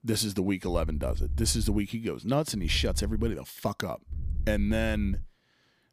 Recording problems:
low rumble; faint; from 0.5 to 2 s, at 2.5 s and from 4 to 5 s; 20 dB below the speech

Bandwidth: 15 kHz